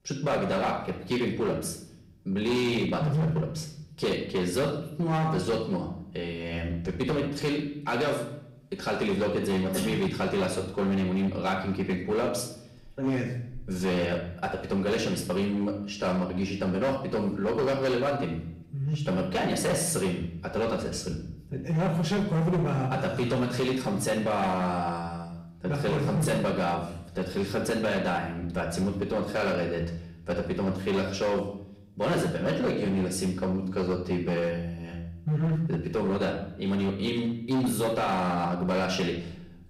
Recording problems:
off-mic speech; far
room echo; slight; dies away in 0.7 s
distortion; slight; 13% of the sound clipped

